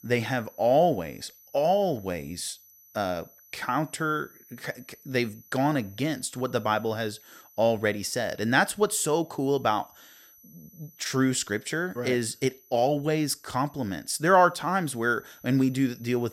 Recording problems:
high-pitched whine; faint; throughout; 12 kHz, 25 dB below the speech

